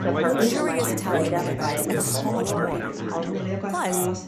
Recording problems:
chatter from many people; very loud; throughout; 3 dB above the speech

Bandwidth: 14.5 kHz